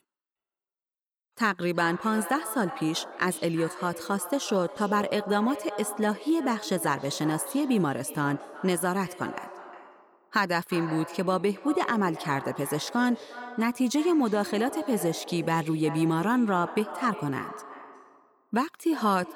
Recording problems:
echo of what is said; noticeable; throughout; 360 ms later, 15 dB below the speech

